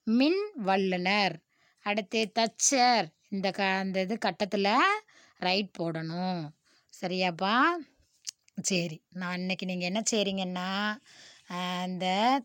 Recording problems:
none

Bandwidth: 16.5 kHz